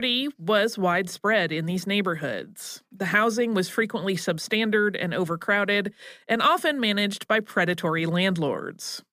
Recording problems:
abrupt cut into speech; at the start

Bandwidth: 15 kHz